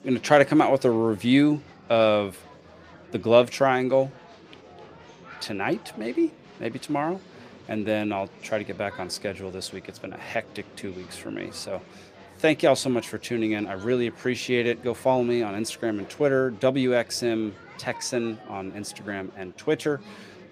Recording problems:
murmuring crowd; faint; throughout; 20 dB below the speech

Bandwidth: 15 kHz